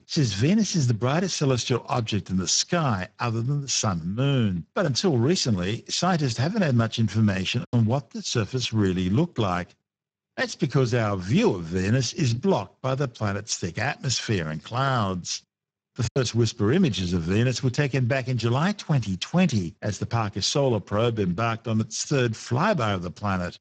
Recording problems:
garbled, watery; badly

